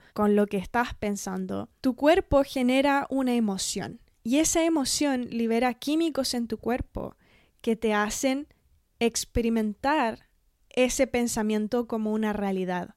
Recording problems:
none

